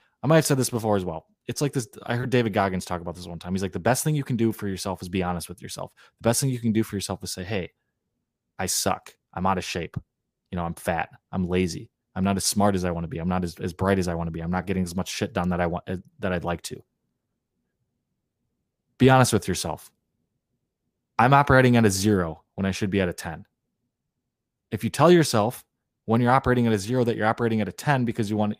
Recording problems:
none

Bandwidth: 15 kHz